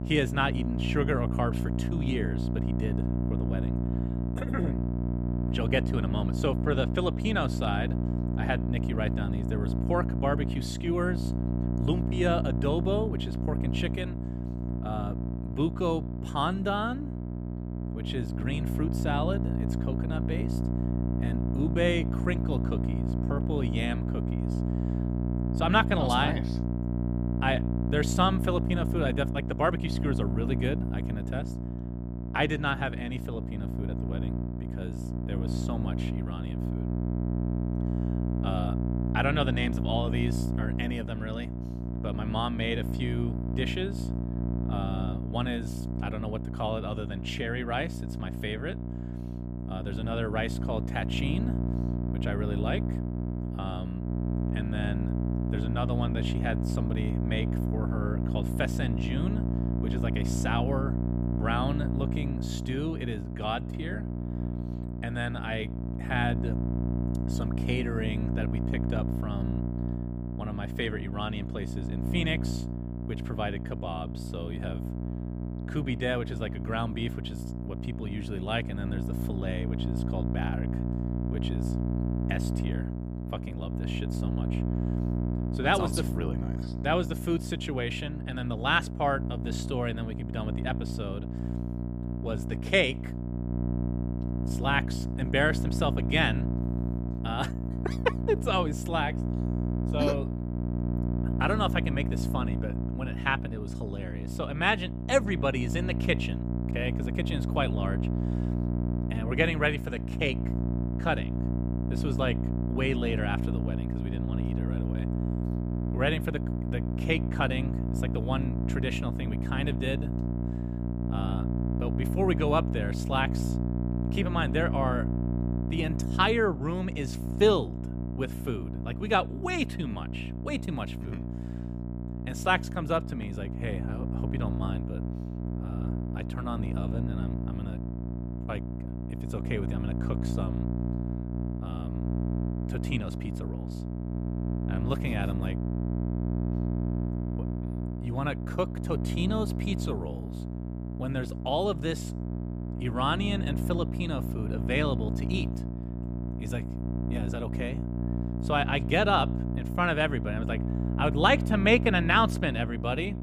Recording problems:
electrical hum; loud; throughout; 60 Hz, 8 dB below the speech

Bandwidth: 15 kHz